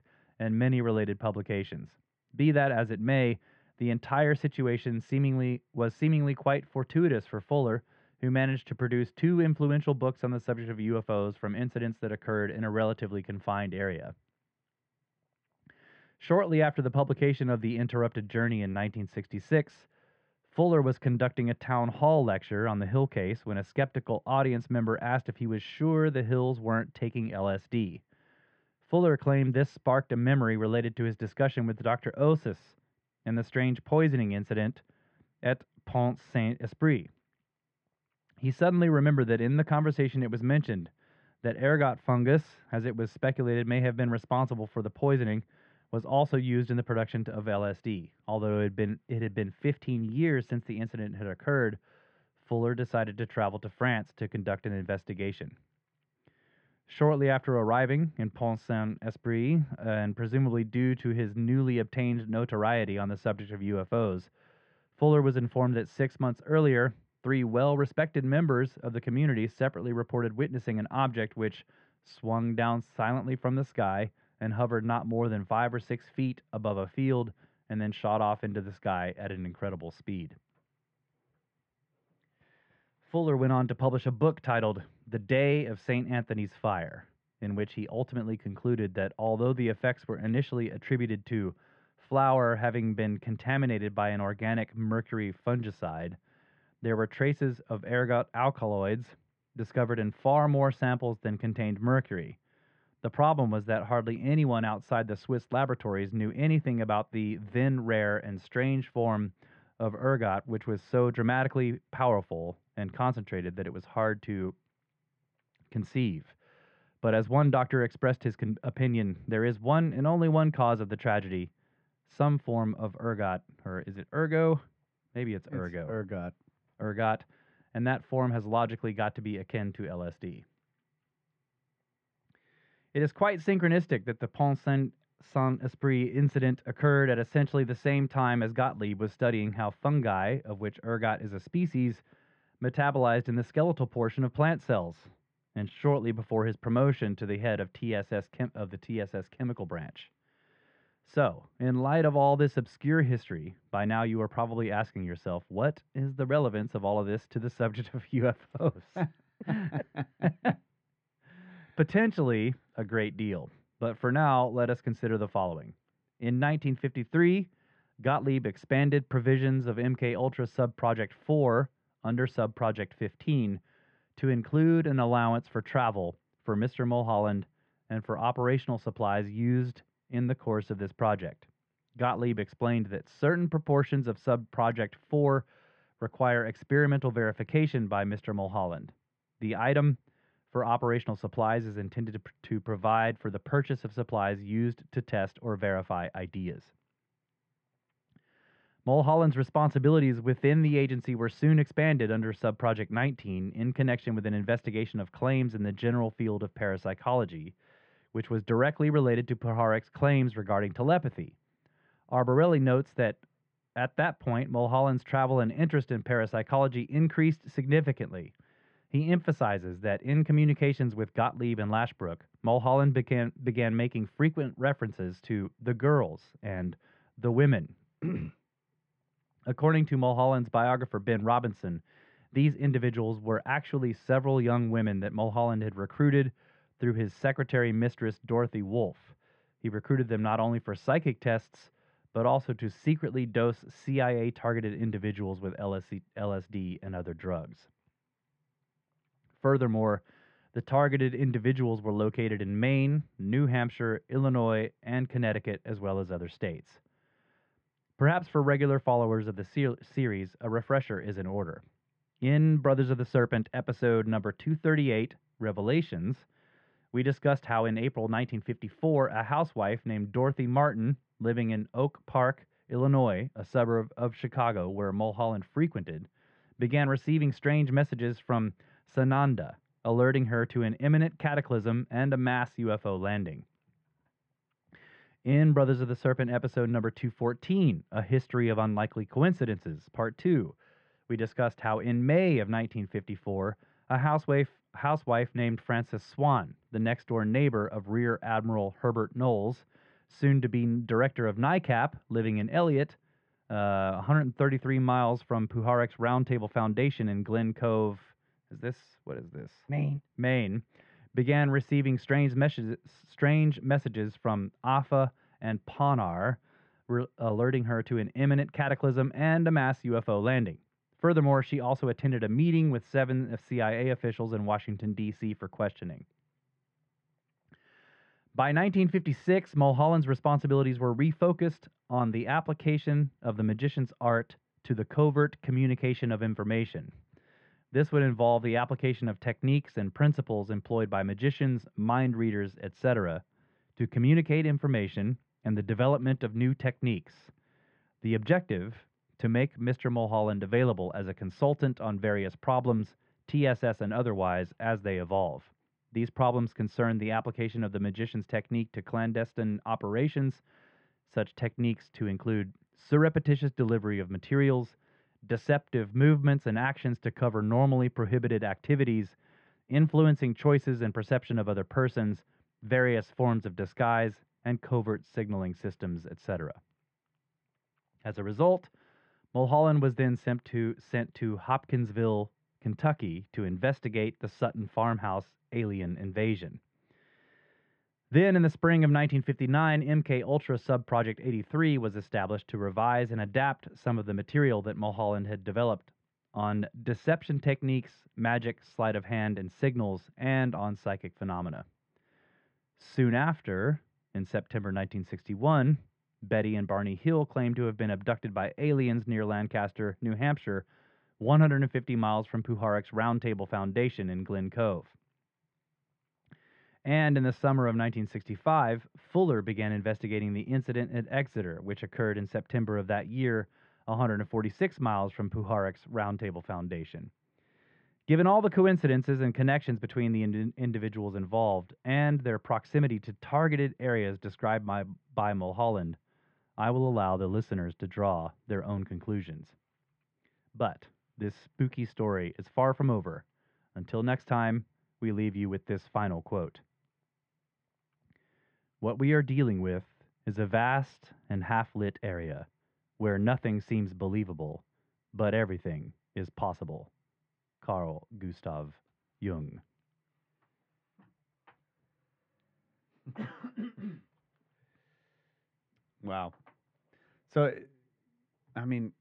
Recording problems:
muffled; very; fading above 2.5 kHz

